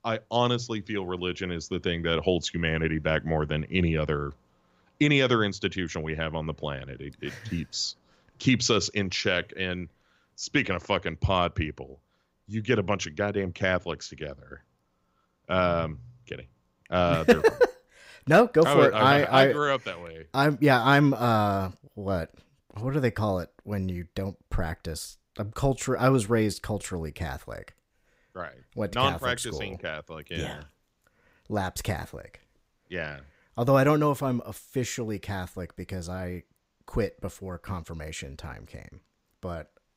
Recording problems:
none

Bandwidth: 15.5 kHz